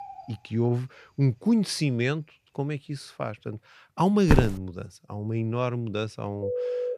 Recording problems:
animal sounds; faint; throughout; 25 dB below the speech
footsteps; loud; at 4.5 s; peak 3 dB above the speech
phone ringing; noticeable; at 6.5 s; peak 2 dB below the speech

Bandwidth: 14.5 kHz